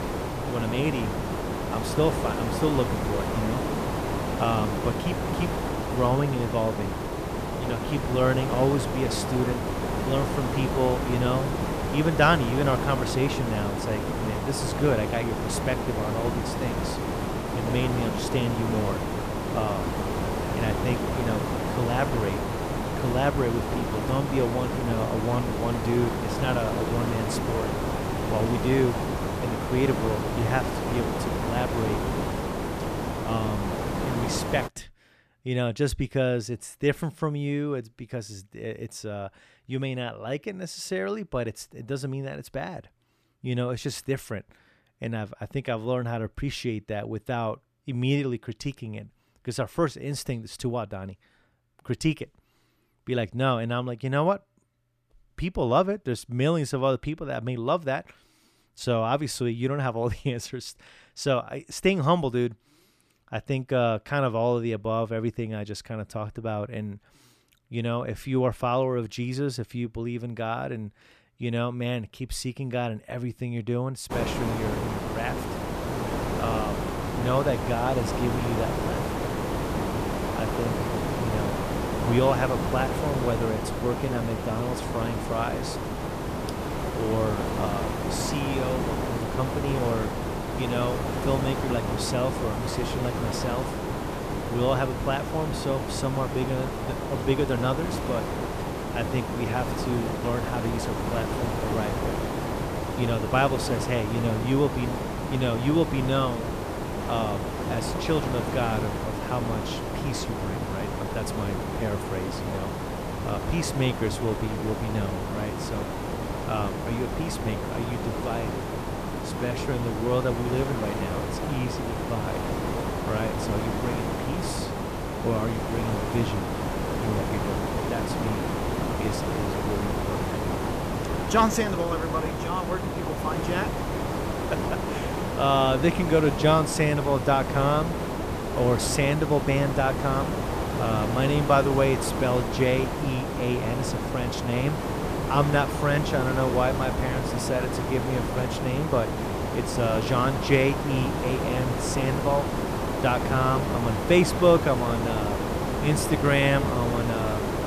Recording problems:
hiss; loud; until 35 s and from 1:14 on; 1 dB below the speech

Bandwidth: 14.5 kHz